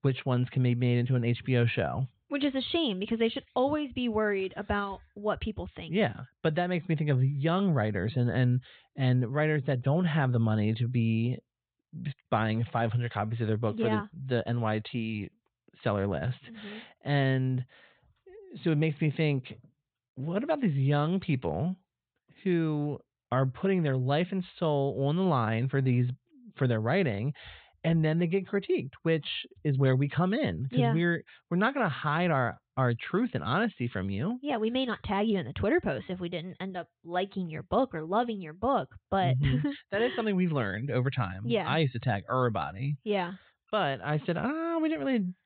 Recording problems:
high frequencies cut off; severe; nothing above 4 kHz

